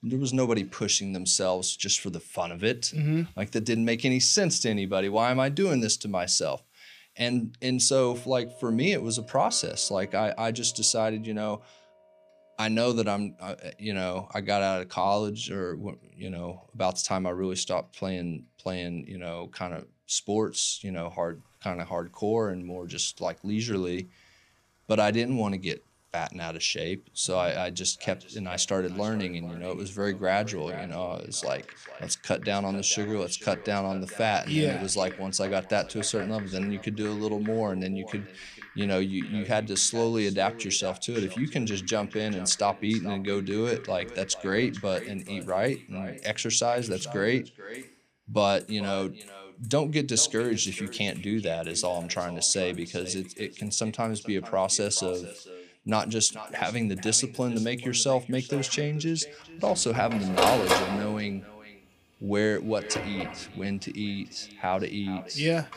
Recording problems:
echo of what is said; noticeable; from 28 s on; 440 ms later, 15 dB below the speech
household noises; noticeable; throughout; 10 dB below the speech

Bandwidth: 15 kHz